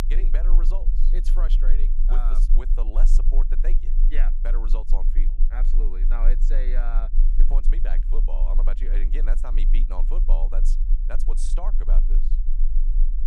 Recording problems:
low rumble; noticeable; throughout; 10 dB below the speech

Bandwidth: 15 kHz